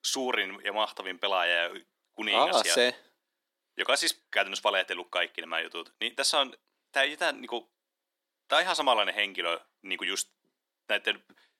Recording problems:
thin; somewhat; fading below 300 Hz

